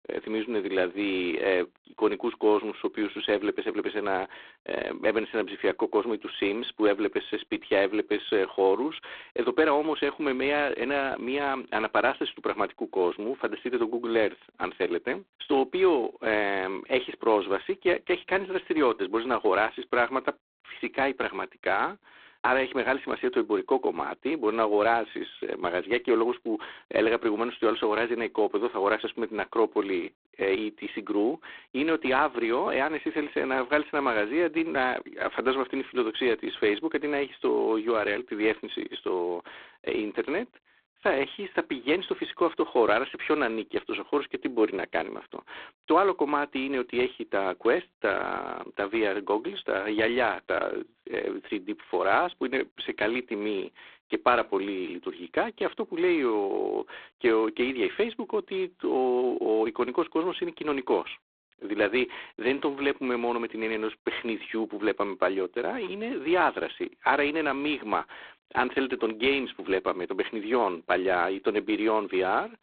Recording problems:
phone-call audio; poor line; nothing above 3.5 kHz

